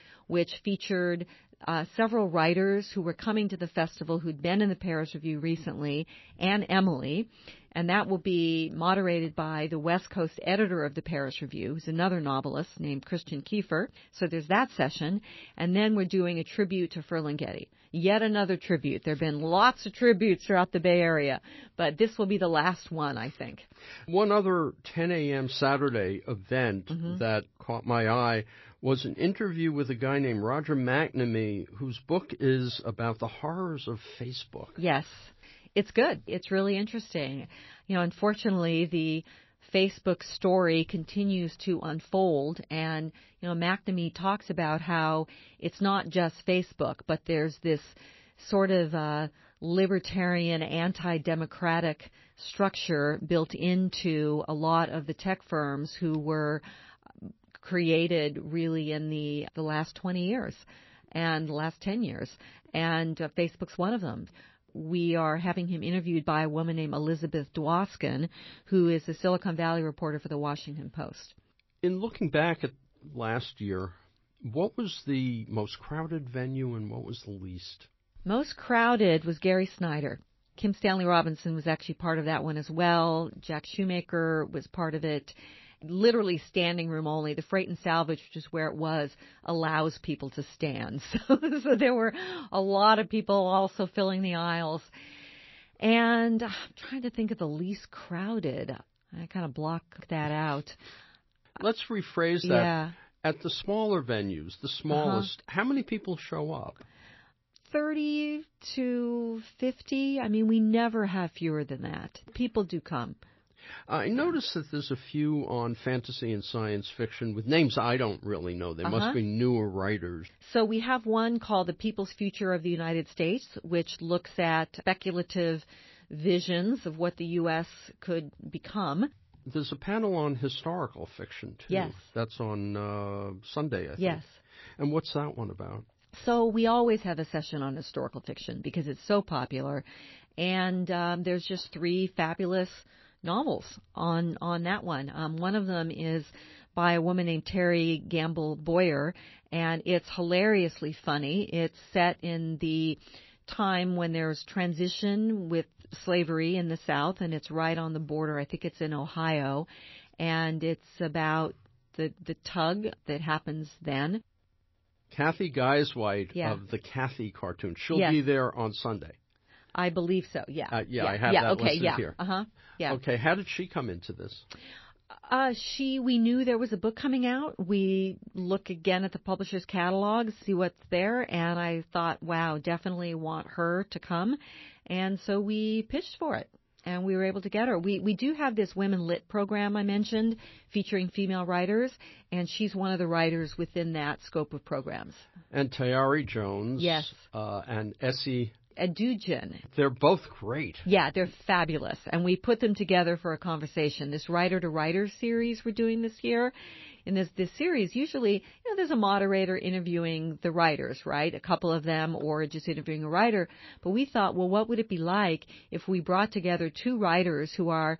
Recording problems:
garbled, watery; slightly; nothing above 5.5 kHz

